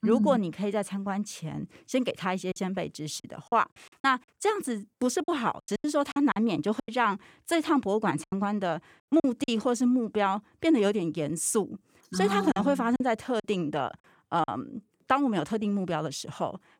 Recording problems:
choppy; very; from 2.5 to 4 s, from 5 to 9.5 s and from 13 to 14 s; 11% of the speech affected

